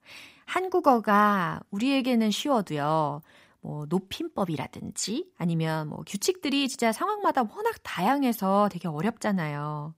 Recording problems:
none

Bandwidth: 15.5 kHz